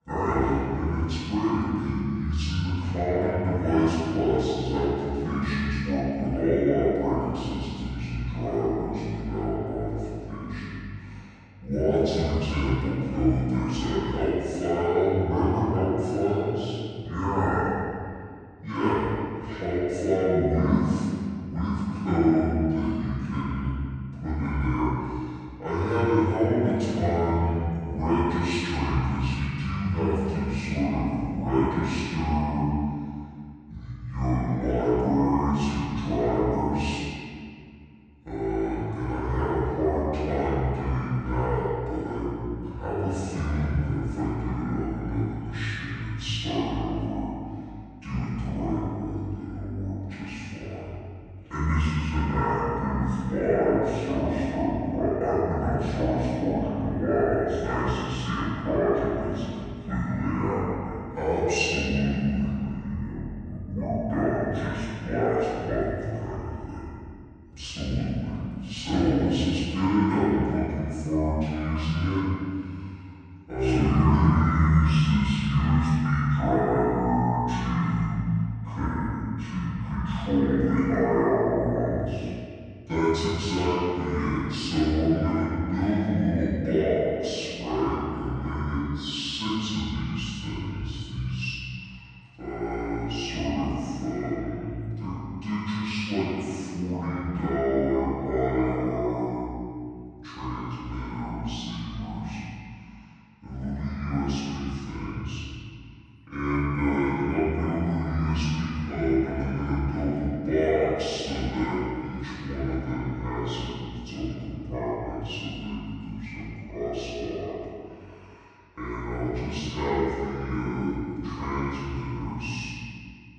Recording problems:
room echo; strong; dies away in 2 s
off-mic speech; far
wrong speed and pitch; too slow and too low; 0.6 times normal speed

